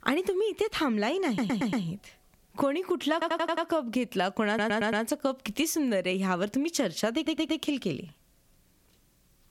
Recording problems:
squashed, flat; somewhat
audio stuttering; 4 times, first at 1.5 s

